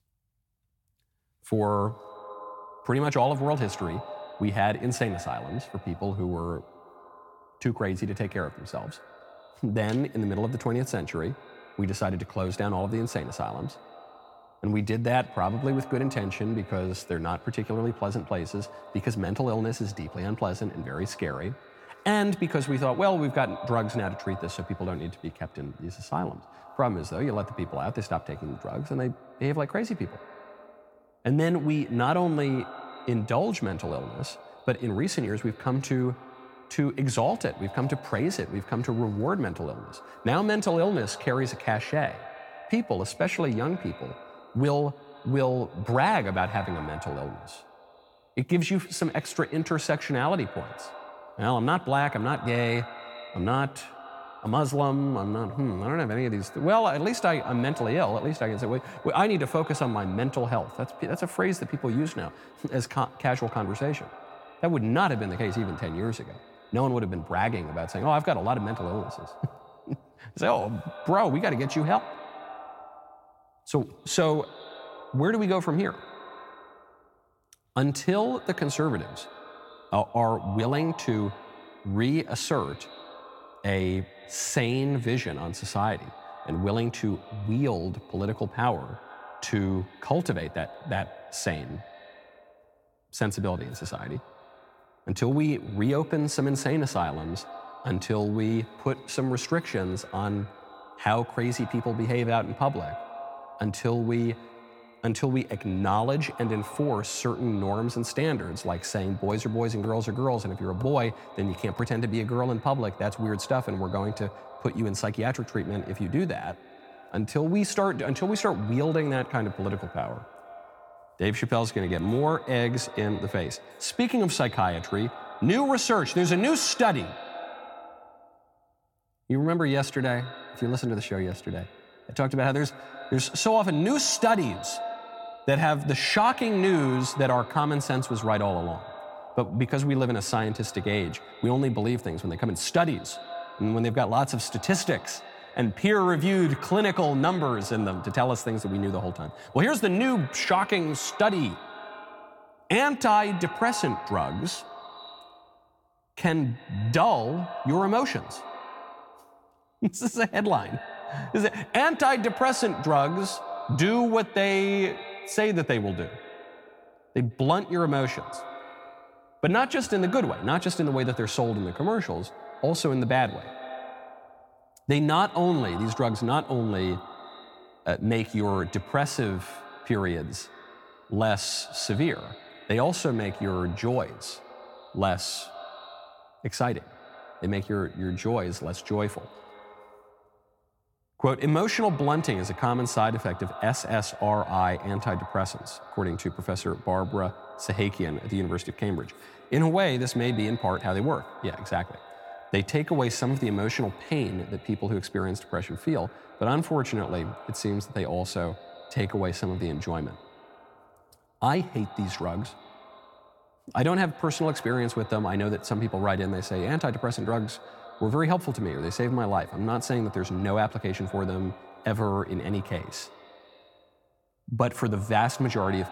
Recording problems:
echo of what is said; noticeable; throughout; 140 ms later, 15 dB below the speech

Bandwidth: 17 kHz